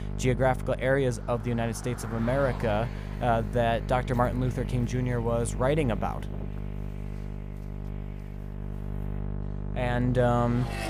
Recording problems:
electrical hum; noticeable; throughout; 50 Hz, 15 dB below the speech
traffic noise; faint; throughout; 20 dB below the speech

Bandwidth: 15 kHz